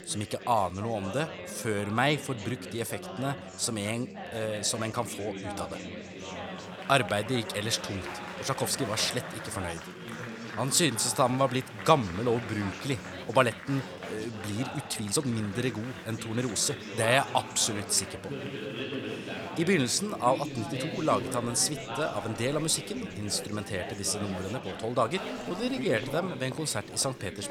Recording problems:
chatter from many people; loud; throughout; 9 dB below the speech
uneven, jittery; strongly; from 1.5 to 26 s

